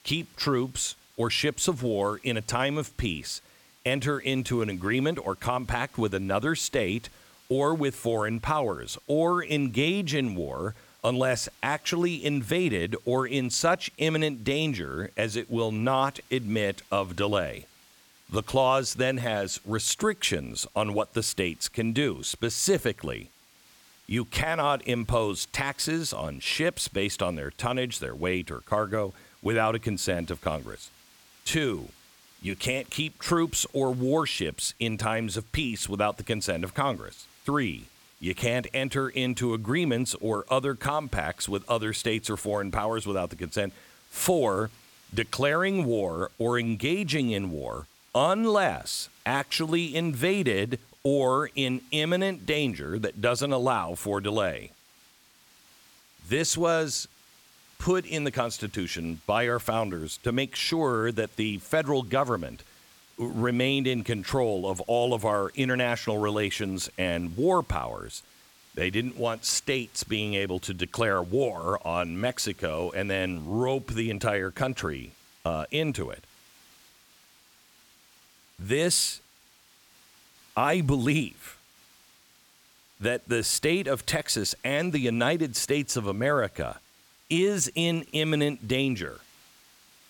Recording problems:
hiss; faint; throughout; 25 dB below the speech

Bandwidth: 17.5 kHz